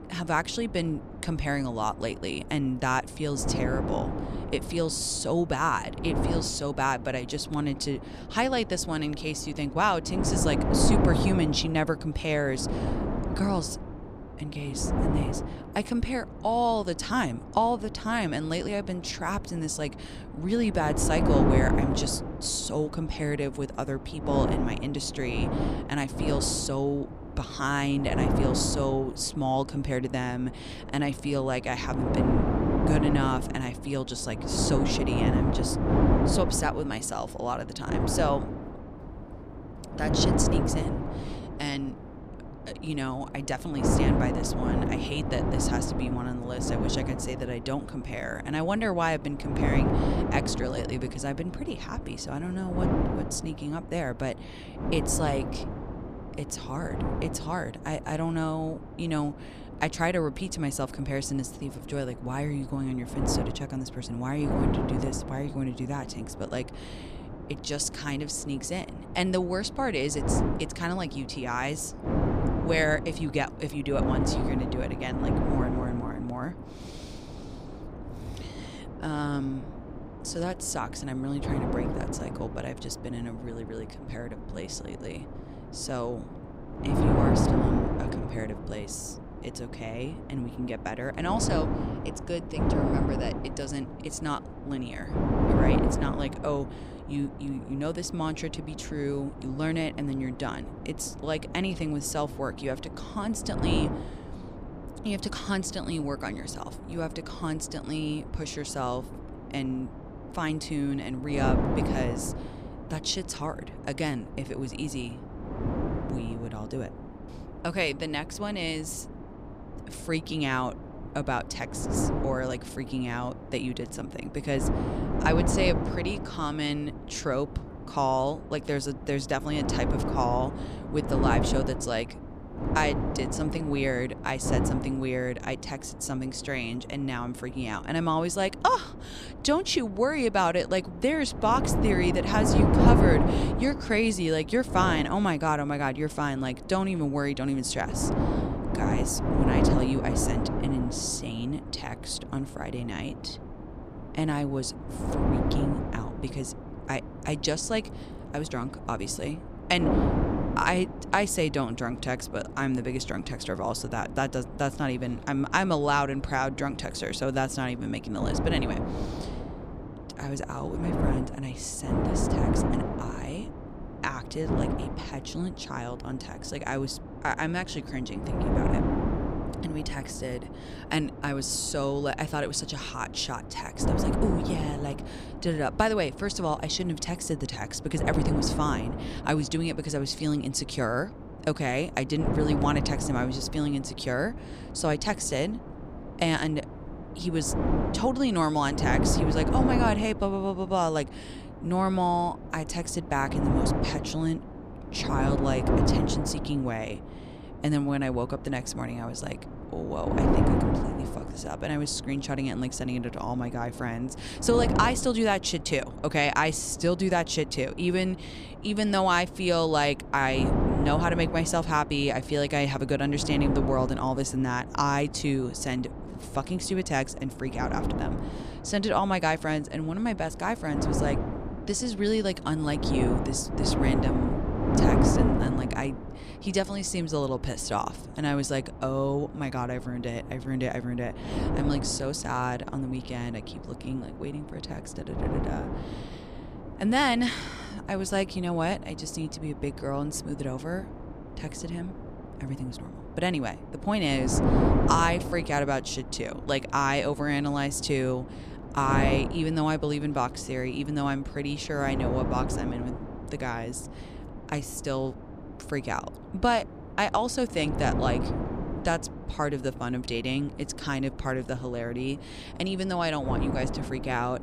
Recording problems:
wind noise on the microphone; heavy; 6 dB below the speech

